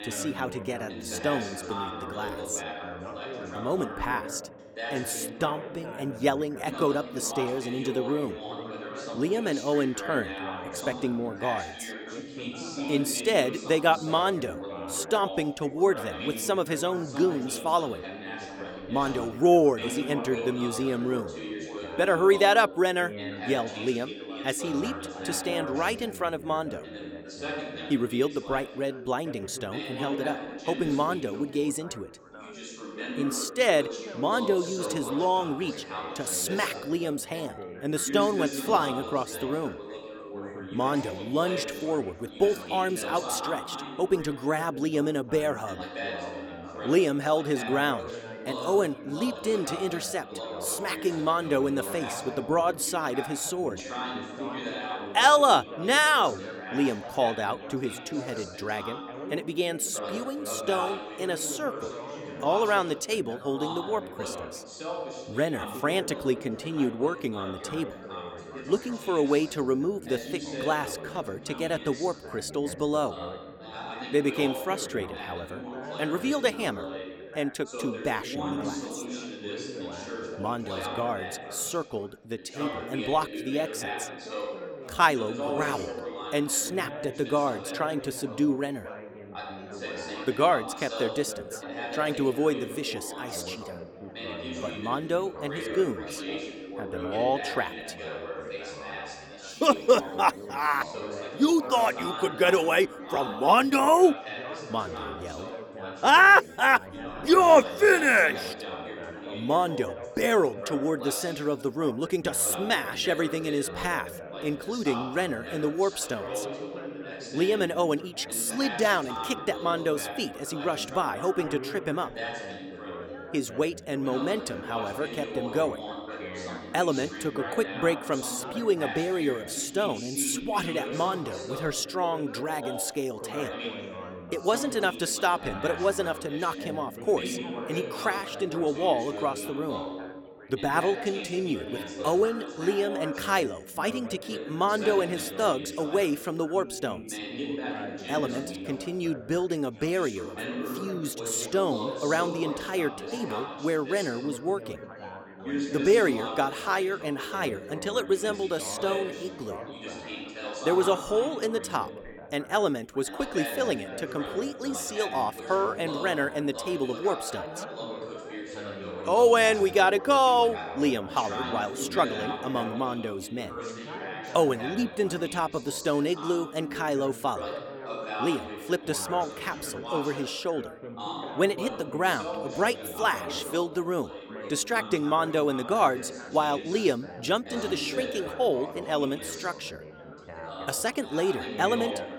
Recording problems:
background chatter; loud; throughout; 4 voices, 9 dB below the speech

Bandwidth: 18.5 kHz